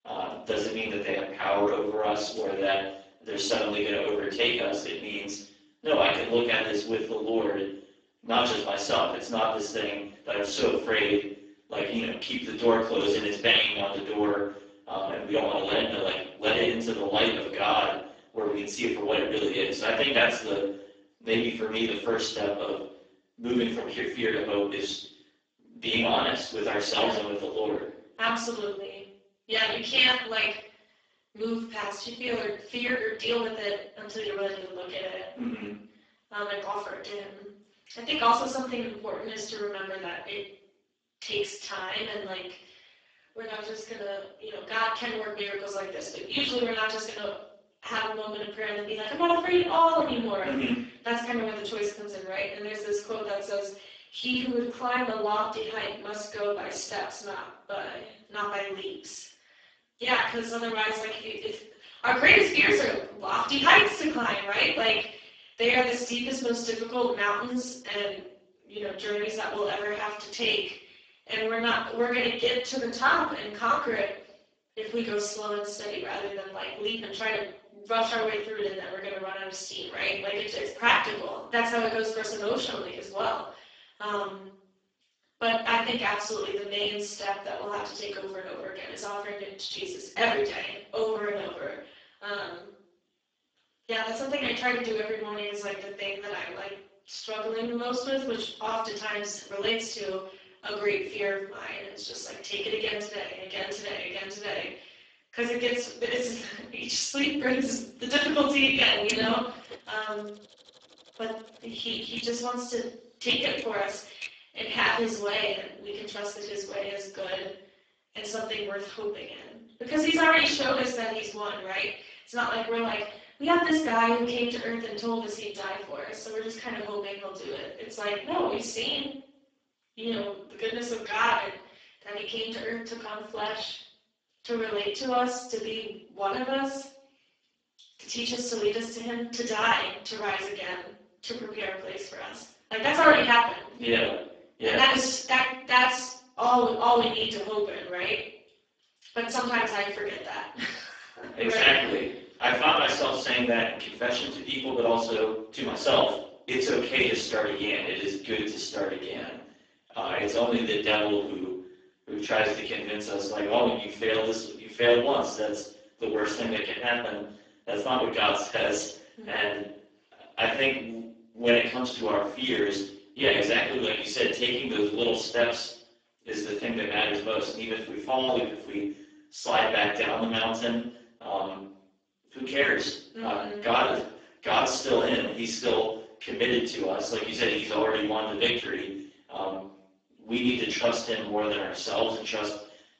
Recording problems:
off-mic speech; far
garbled, watery; badly; nothing above 7.5 kHz
room echo; noticeable; dies away in 0.5 s
thin; somewhat; fading below 300 Hz
keyboard typing; faint; from 1:49 to 1:54; peak 10 dB below the speech

